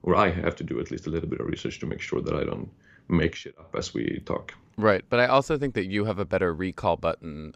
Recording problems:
none

